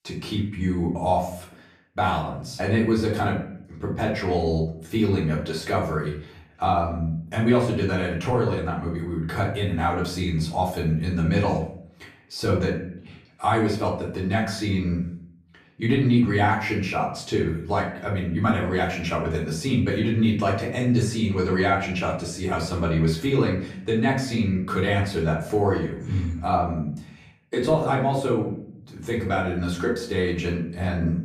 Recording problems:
off-mic speech; far
room echo; slight; dies away in 0.5 s

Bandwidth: 14.5 kHz